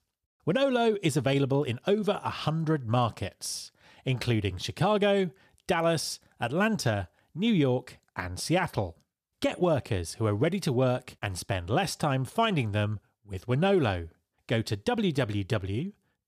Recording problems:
none

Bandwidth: 14.5 kHz